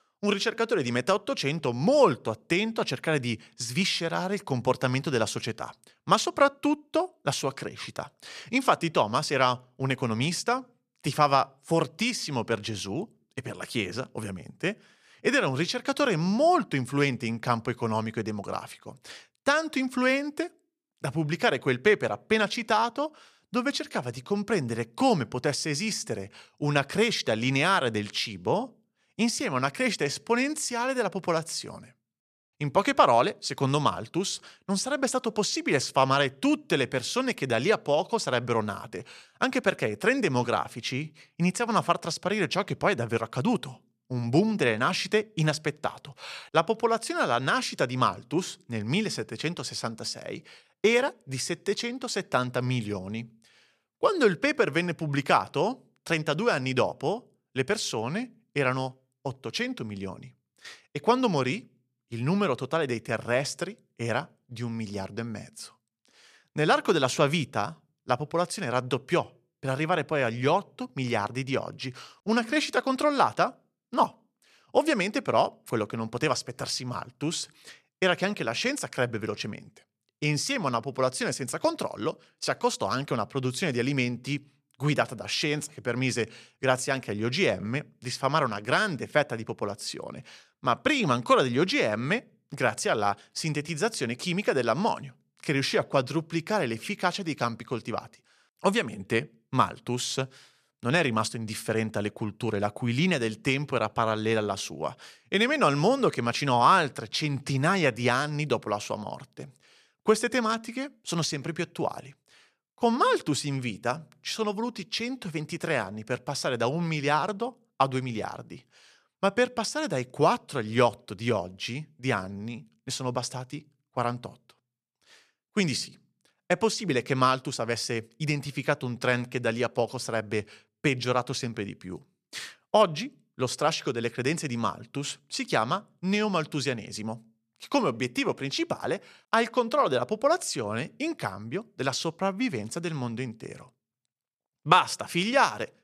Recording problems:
none

